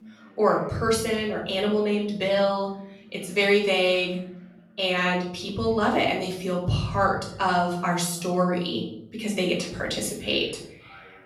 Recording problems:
off-mic speech; far
room echo; noticeable; dies away in 0.8 s
voice in the background; faint; throughout; 30 dB below the speech

